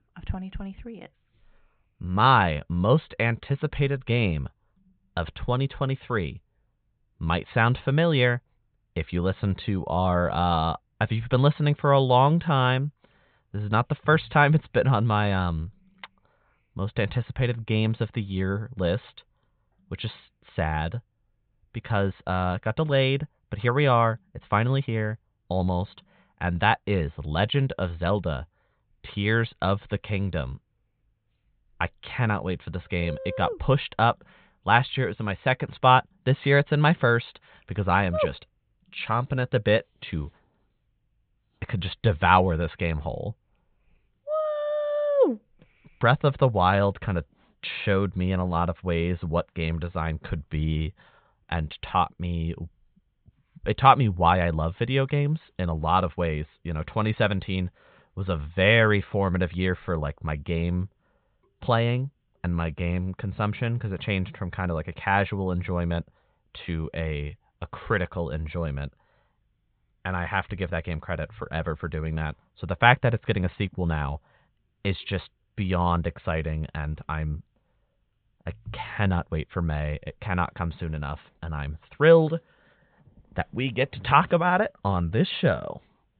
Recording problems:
high frequencies cut off; severe; nothing above 4 kHz

